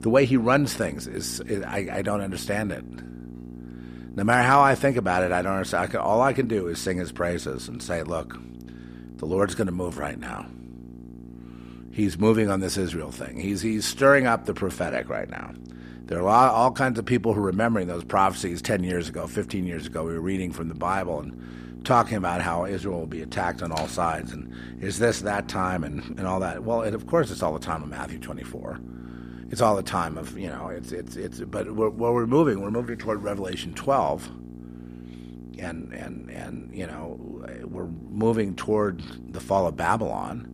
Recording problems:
electrical hum; faint; throughout; 60 Hz, 20 dB below the speech

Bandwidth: 14.5 kHz